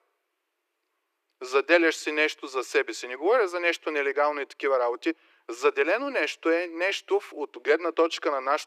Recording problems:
thin; very; fading below 300 Hz

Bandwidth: 14.5 kHz